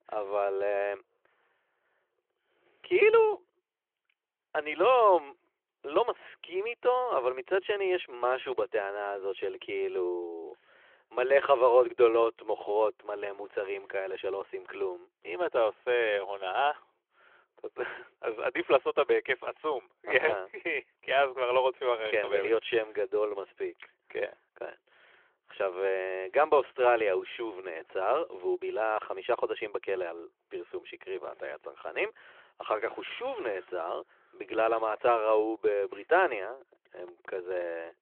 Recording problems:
phone-call audio

